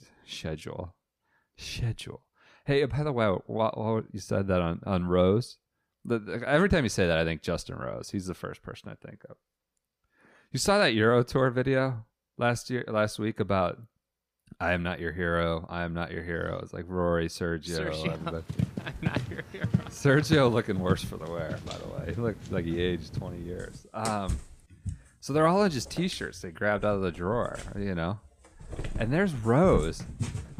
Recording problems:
animal sounds; loud; from 18 s on; 8 dB below the speech

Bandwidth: 15 kHz